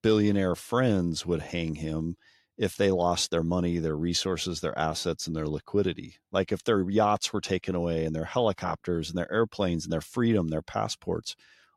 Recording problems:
none

